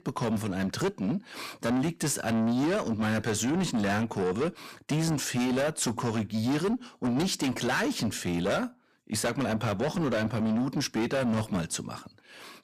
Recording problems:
distortion; heavy; 6 dB below the speech

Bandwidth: 14.5 kHz